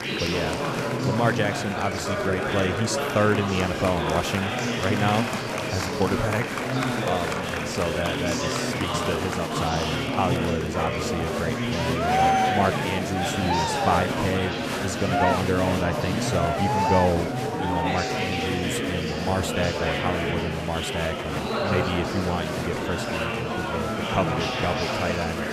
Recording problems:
murmuring crowd; very loud; throughout; 2 dB above the speech

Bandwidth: 14.5 kHz